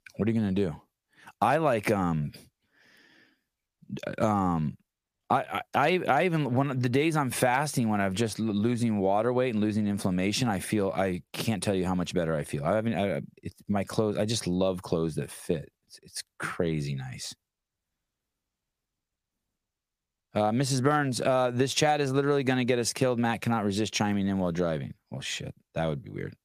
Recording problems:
squashed, flat; heavily

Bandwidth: 15 kHz